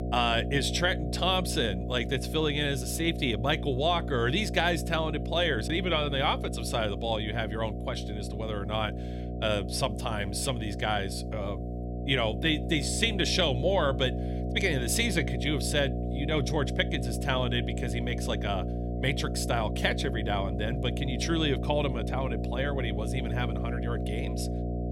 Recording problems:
electrical hum; noticeable; throughout; 60 Hz, 10 dB below the speech

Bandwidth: 16 kHz